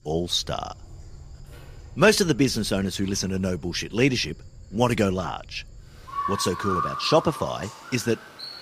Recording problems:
animal sounds; noticeable; throughout; 10 dB below the speech

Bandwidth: 15 kHz